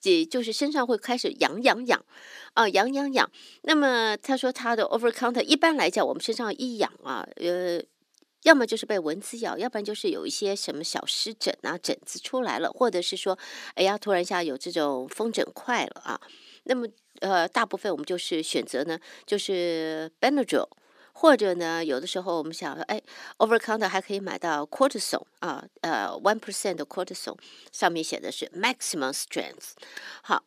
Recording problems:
thin; very slightly; fading below 300 Hz

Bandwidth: 14.5 kHz